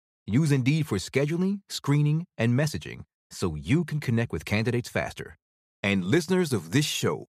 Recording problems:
none

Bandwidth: 14.5 kHz